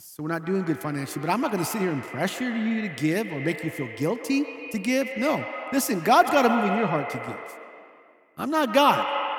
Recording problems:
echo of what is said; strong; throughout; 140 ms later, 7 dB below the speech

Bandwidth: 18.5 kHz